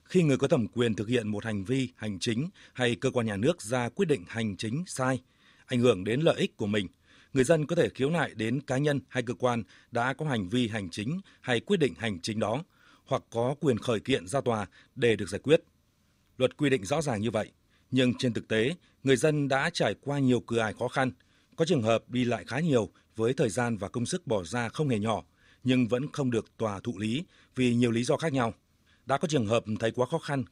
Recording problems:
none

